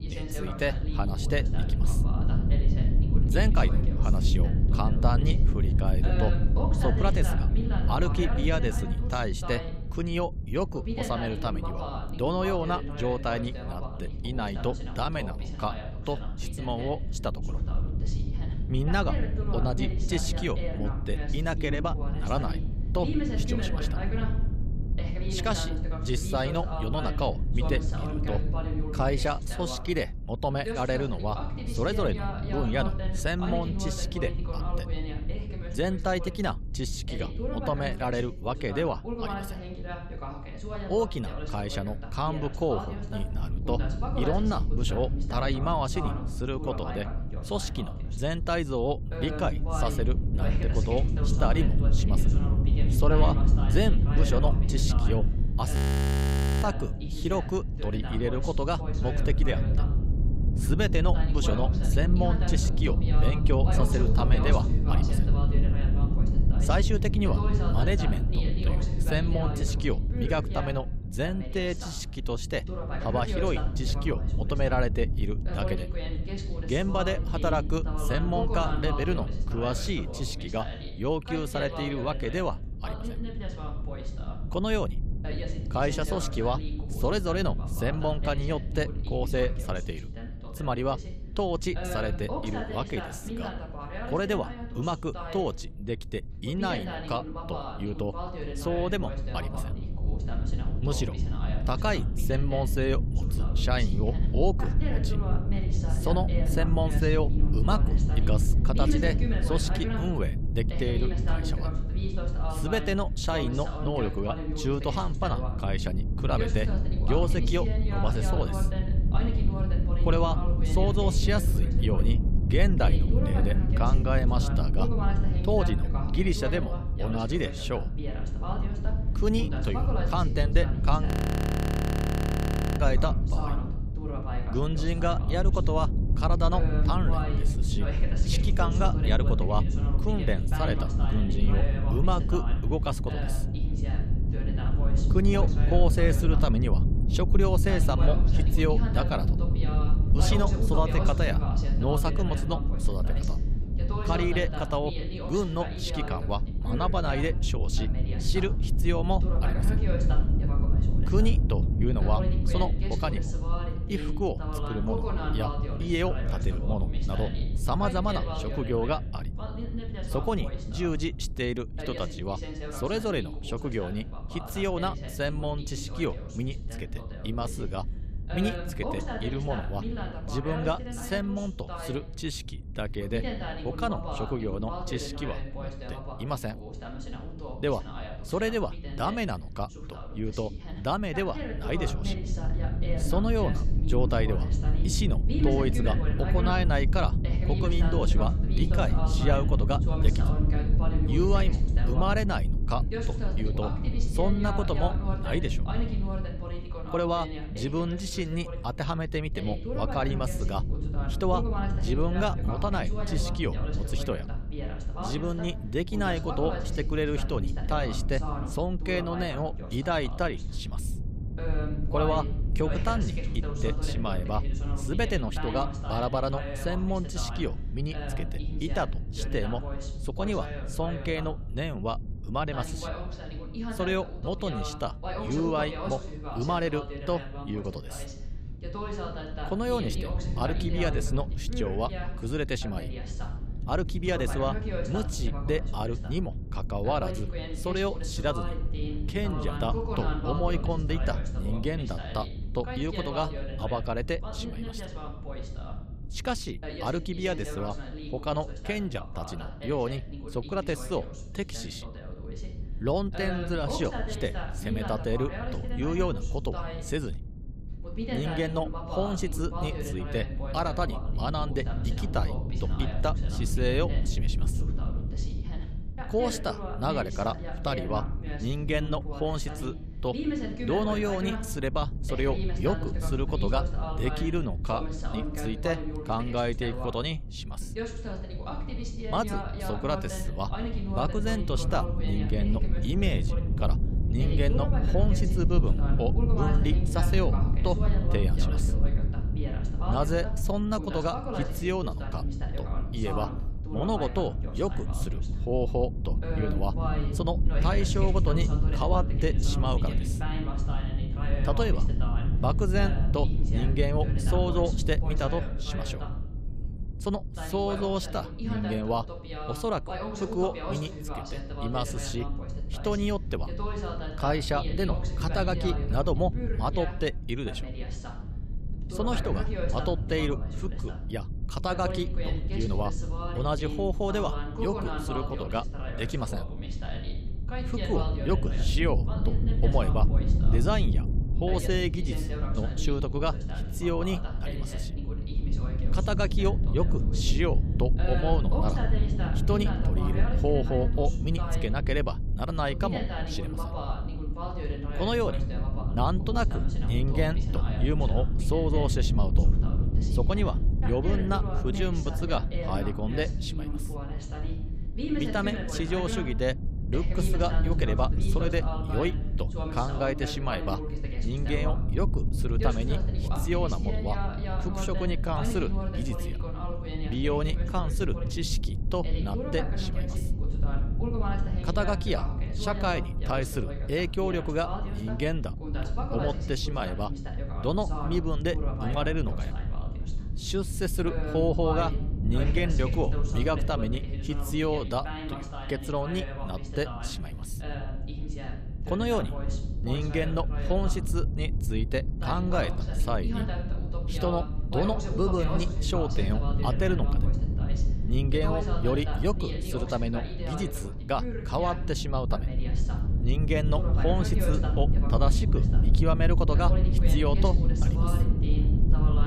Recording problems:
voice in the background; loud; throughout; 8 dB below the speech
low rumble; noticeable; throughout; 10 dB below the speech
audio freezing; at 56 s for 1 s and at 2:11 for 1.5 s

